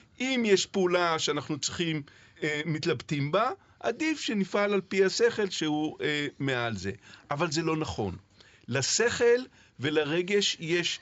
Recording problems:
high frequencies cut off; noticeable; nothing above 7.5 kHz

